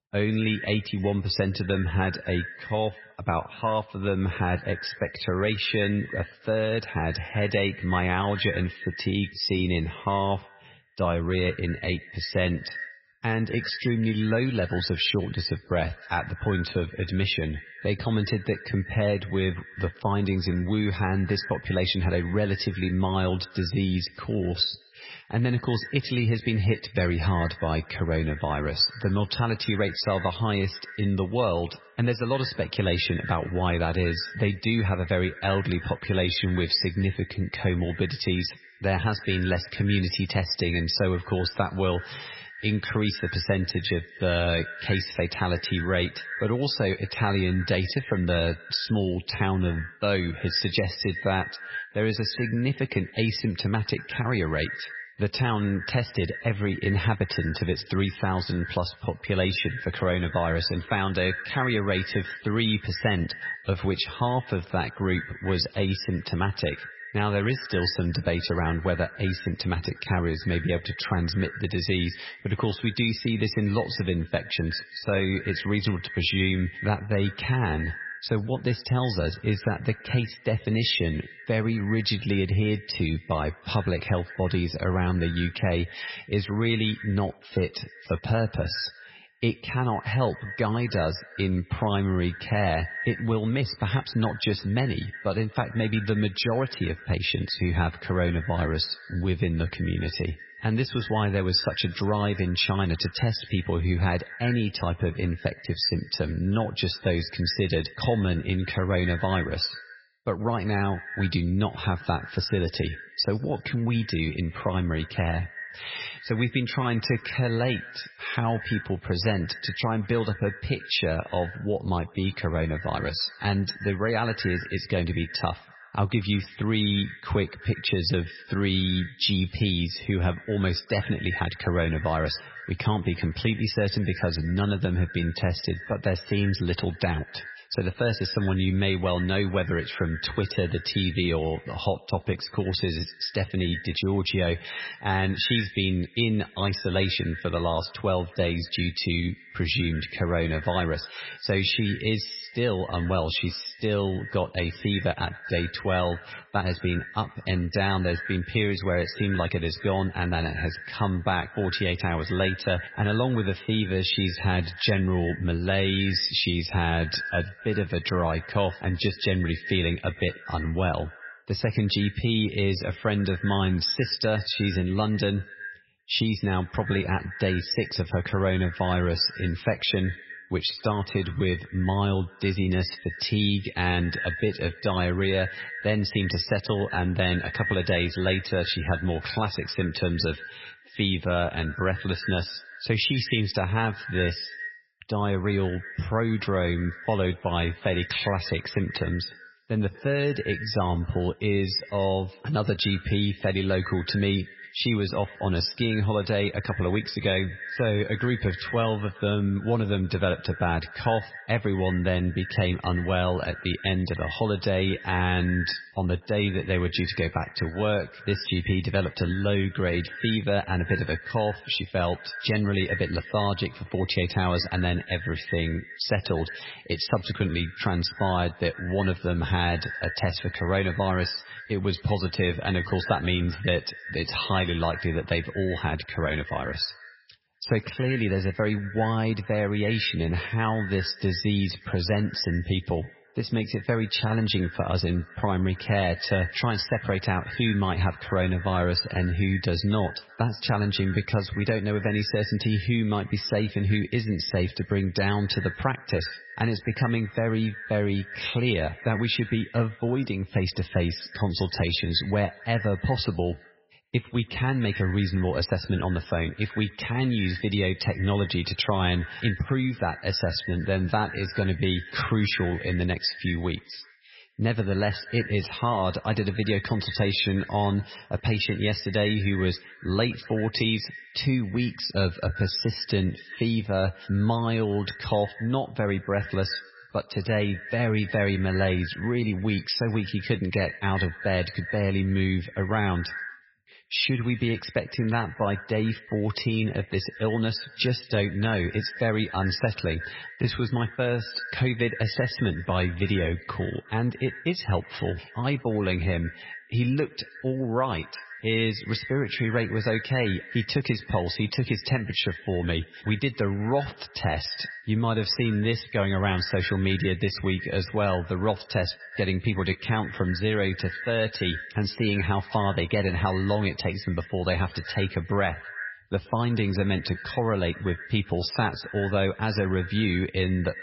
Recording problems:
garbled, watery; badly; nothing above 5.5 kHz
echo of what is said; noticeable; throughout; 120 ms later, 15 dB below the speech

